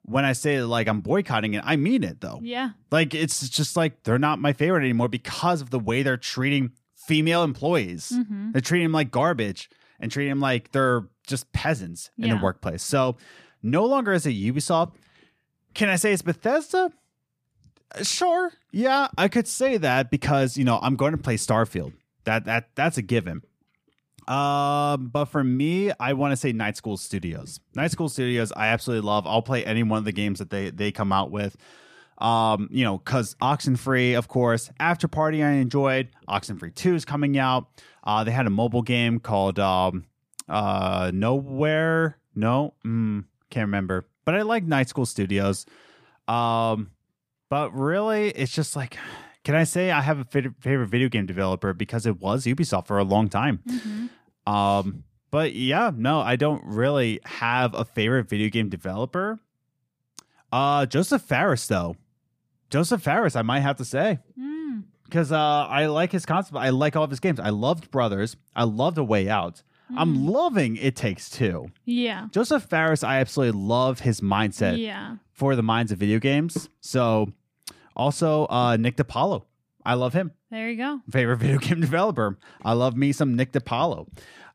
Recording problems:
none

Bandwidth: 15 kHz